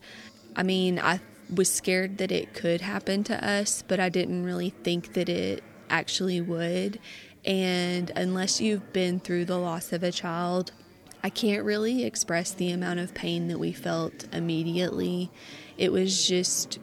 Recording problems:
chatter from many people; faint; throughout; 20 dB below the speech

